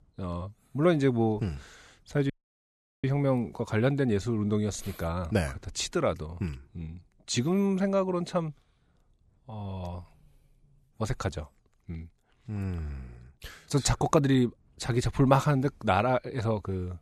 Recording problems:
audio cutting out; at 2.5 s for 0.5 s

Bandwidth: 13.5 kHz